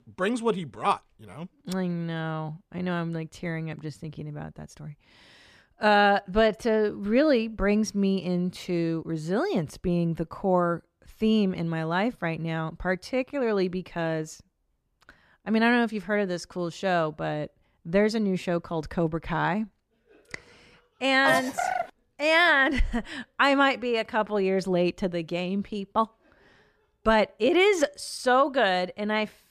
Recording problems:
none

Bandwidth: 14.5 kHz